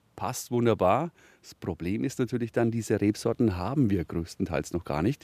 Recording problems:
none

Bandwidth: 14.5 kHz